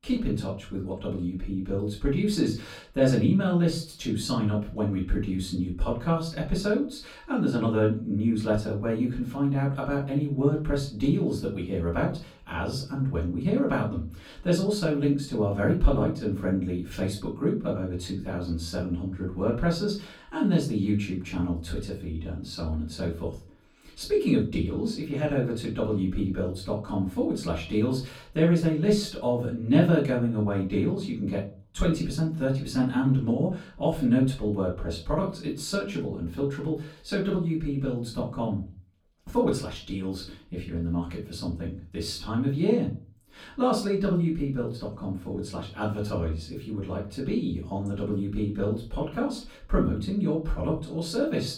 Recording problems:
off-mic speech; far
room echo; slight; dies away in 0.3 s

